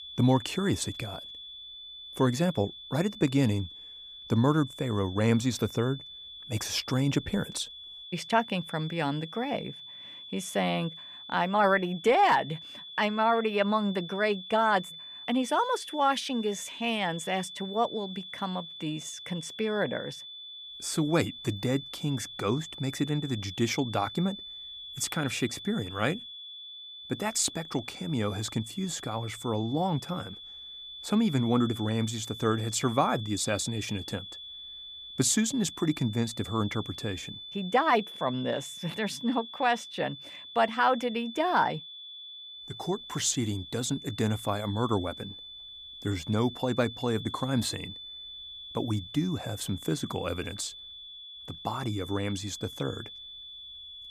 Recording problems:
high-pitched whine; noticeable; throughout; 3.5 kHz, 10 dB below the speech

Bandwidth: 15 kHz